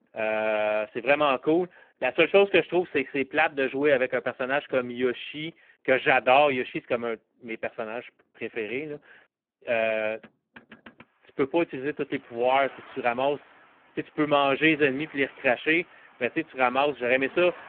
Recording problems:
phone-call audio; poor line
traffic noise; faint; throughout; 25 dB below the speech

